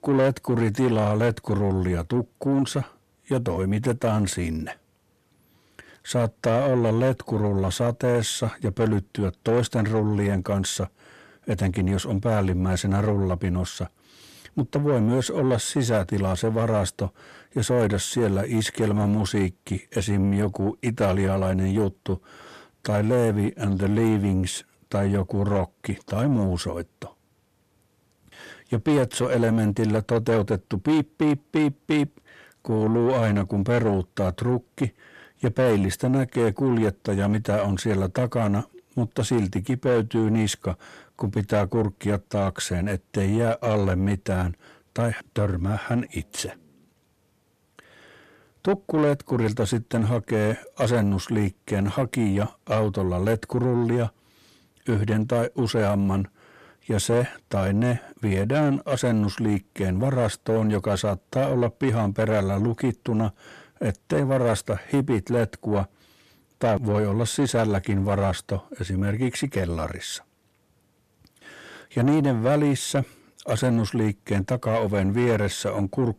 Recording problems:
distortion; slight; 10 dB below the speech

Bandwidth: 14.5 kHz